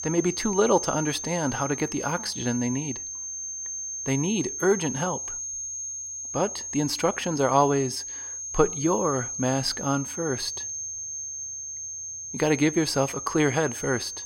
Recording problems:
high-pitched whine; loud; throughout; 6.5 kHz, 6 dB below the speech

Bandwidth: 16 kHz